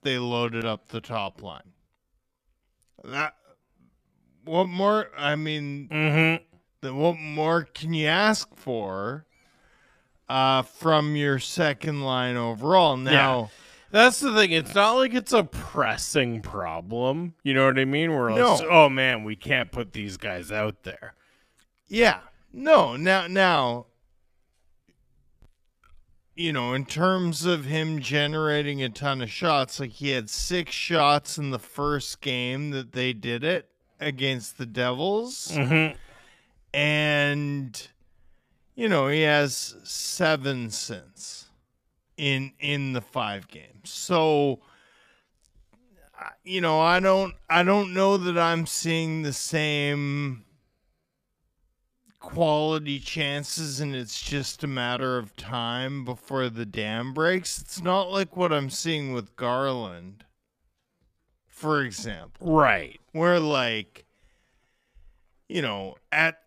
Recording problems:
wrong speed, natural pitch; too slow; 0.6 times normal speed

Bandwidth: 14.5 kHz